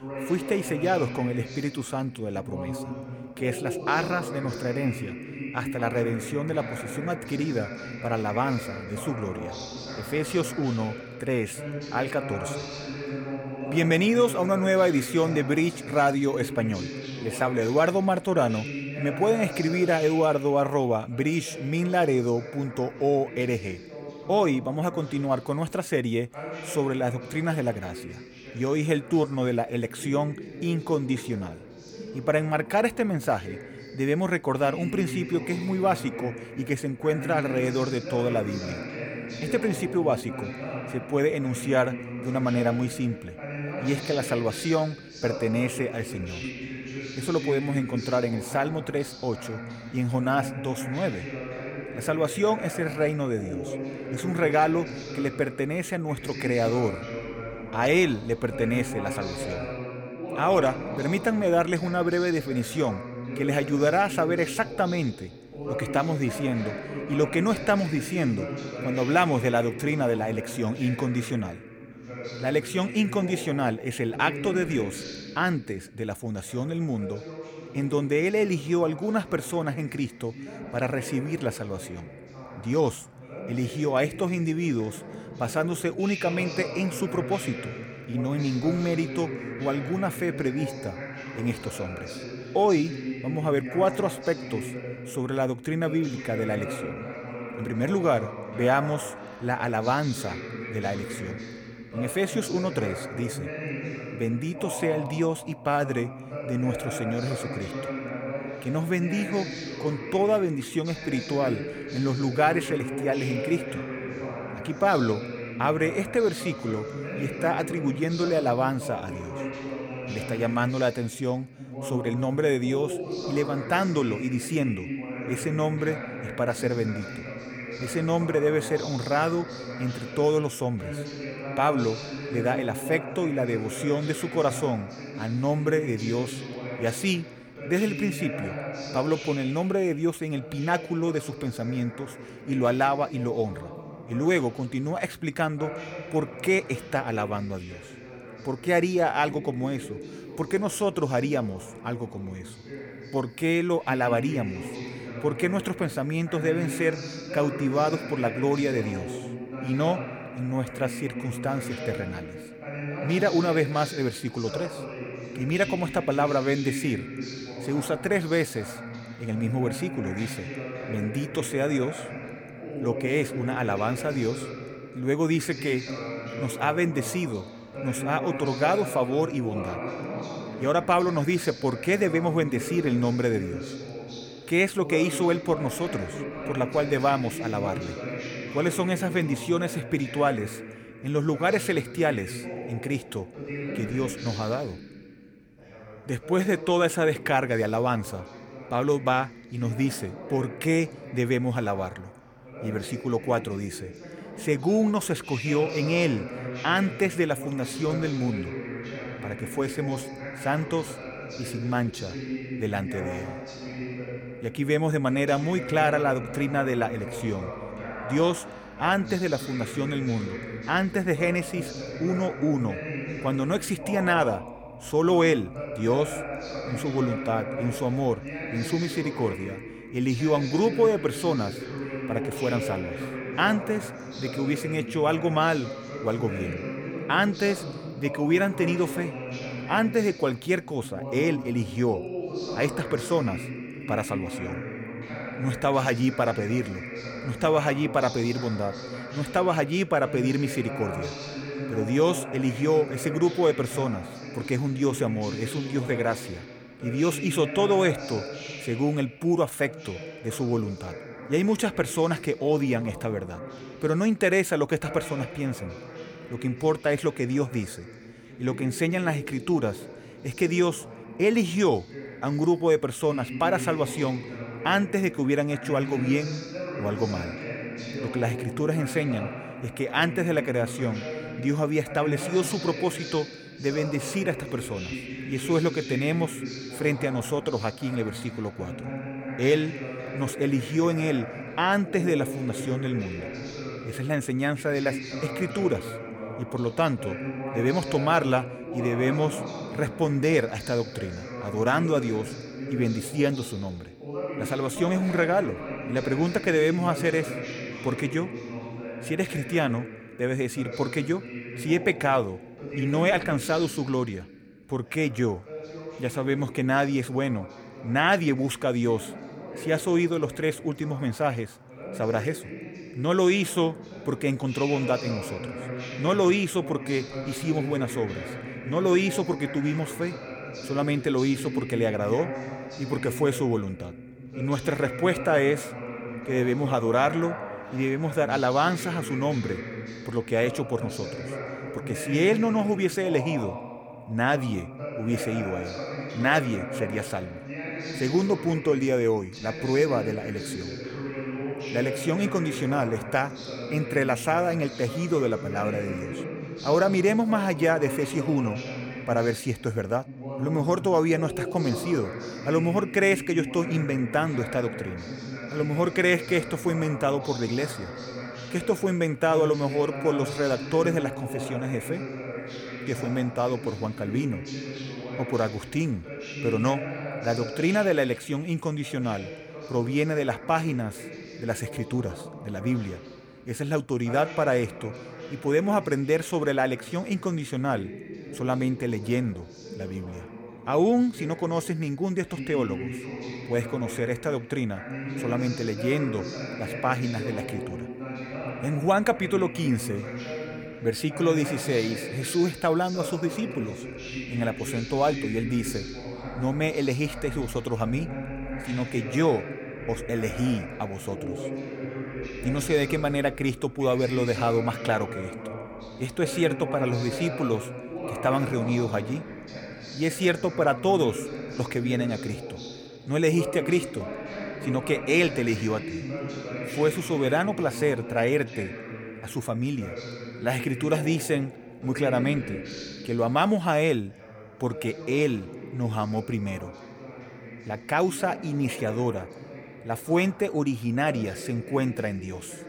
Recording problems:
voice in the background; loud; throughout; 9 dB below the speech

